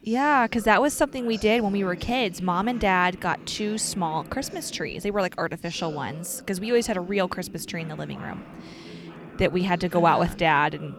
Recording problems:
voice in the background; noticeable; throughout; 20 dB below the speech

